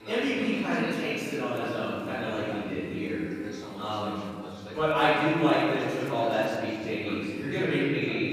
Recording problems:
room echo; strong; dies away in 2.5 s
off-mic speech; far
voice in the background; noticeable; throughout; 15 dB below the speech
electrical hum; faint; throughout; 50 Hz, 20 dB below the speech

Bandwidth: 15 kHz